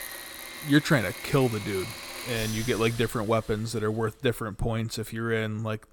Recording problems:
machinery noise; loud; throughout; 10 dB below the speech

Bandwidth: 18 kHz